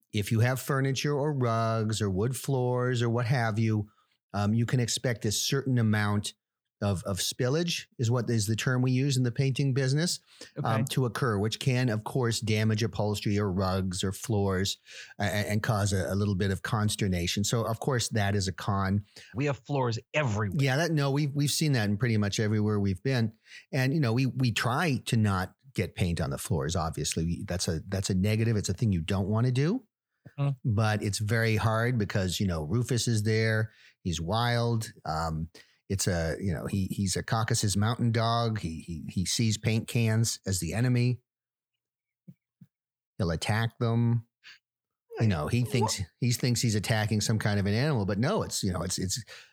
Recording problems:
none

